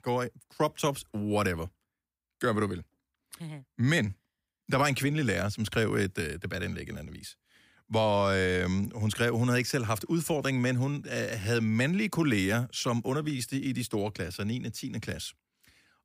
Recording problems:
none

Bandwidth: 15.5 kHz